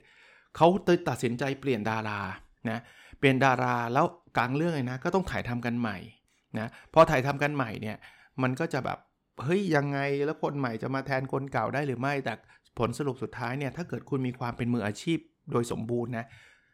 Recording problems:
none

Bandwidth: 18 kHz